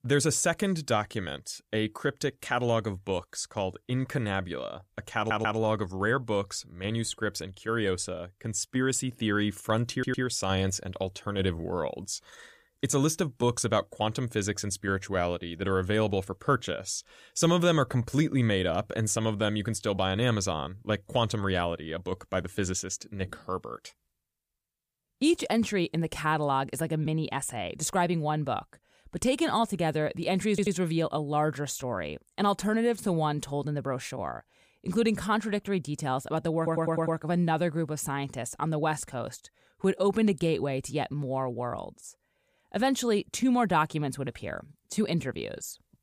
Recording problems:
audio stuttering; 4 times, first at 5 s

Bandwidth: 15 kHz